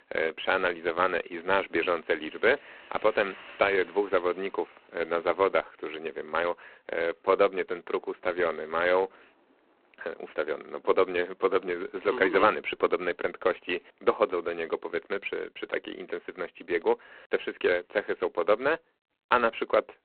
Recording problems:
phone-call audio; poor line; nothing above 4 kHz
traffic noise; faint; until 14 s; 25 dB below the speech

